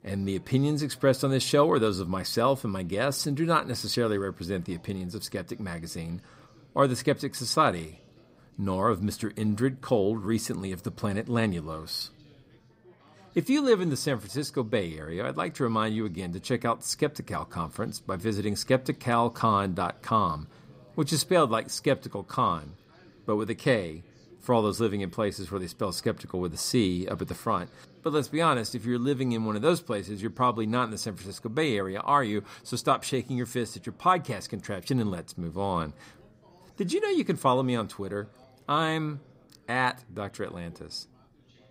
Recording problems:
background chatter; faint; throughout; 4 voices, 30 dB below the speech

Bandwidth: 15.5 kHz